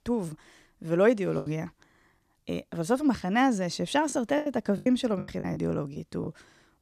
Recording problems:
choppy; very; 9% of the speech affected

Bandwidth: 14.5 kHz